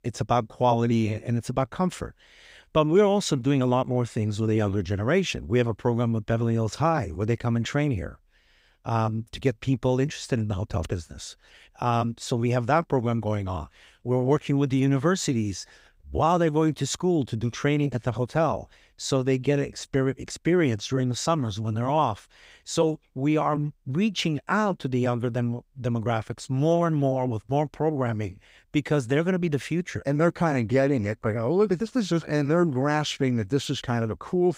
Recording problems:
none

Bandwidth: 15.5 kHz